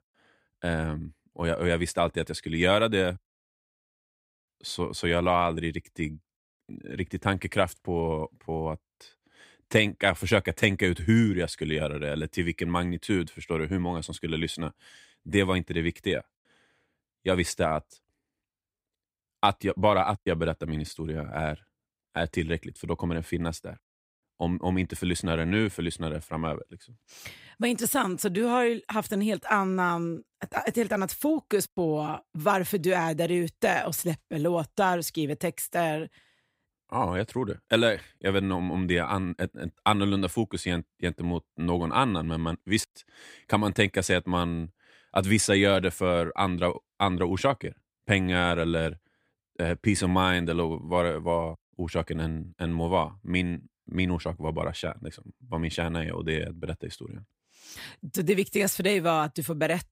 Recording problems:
none

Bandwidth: 15.5 kHz